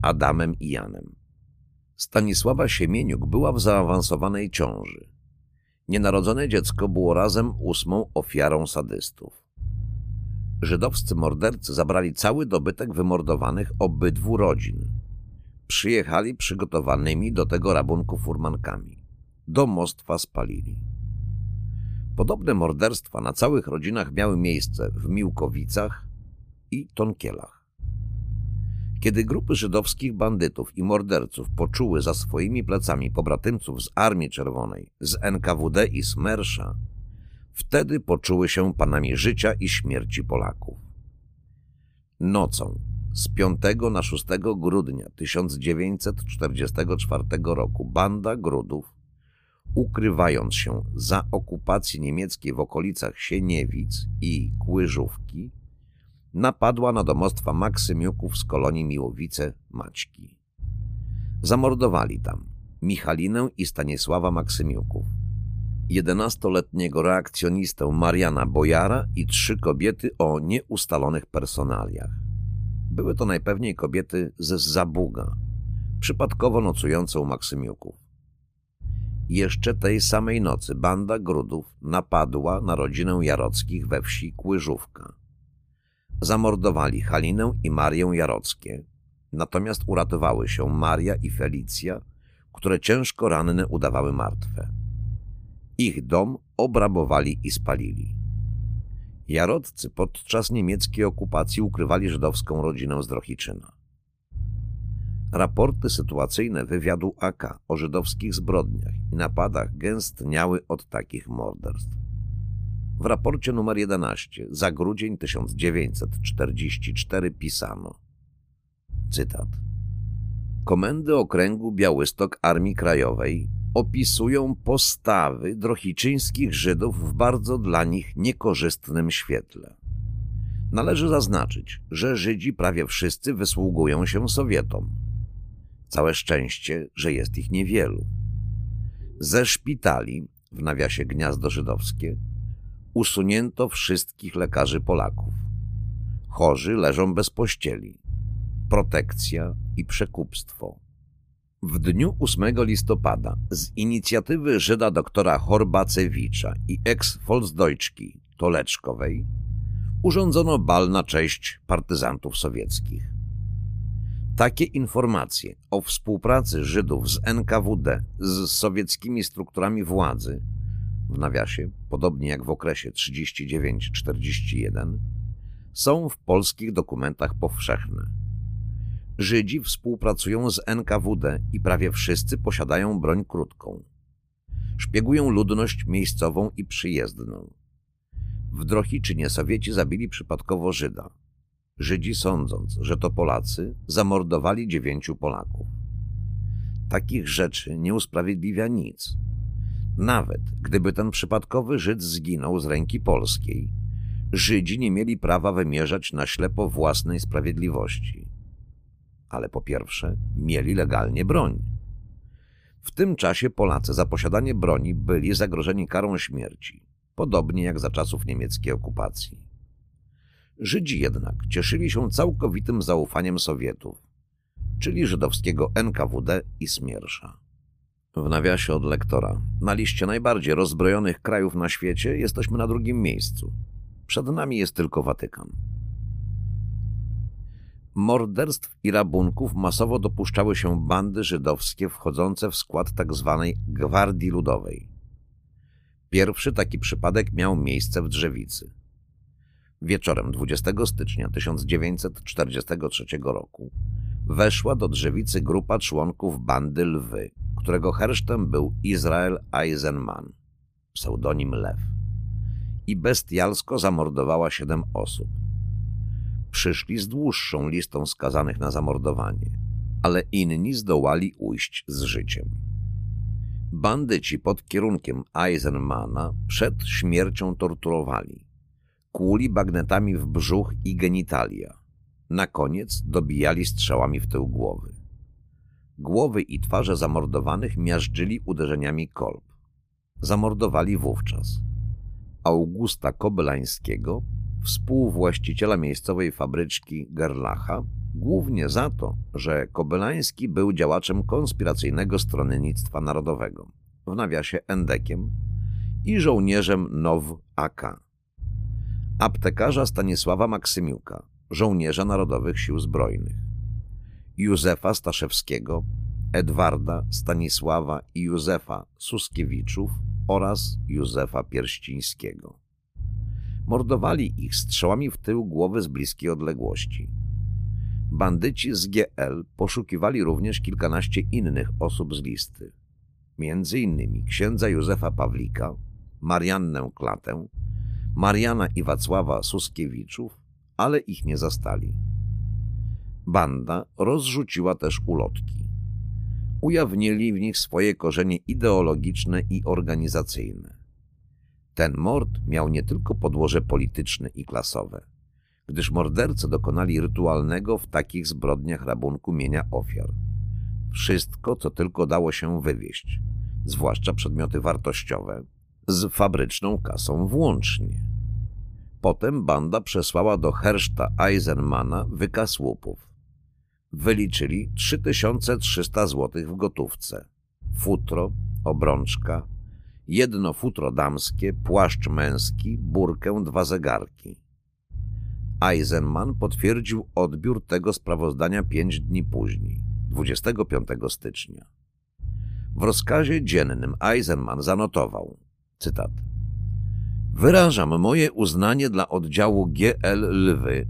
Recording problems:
low rumble; faint; throughout; 20 dB below the speech

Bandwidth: 15 kHz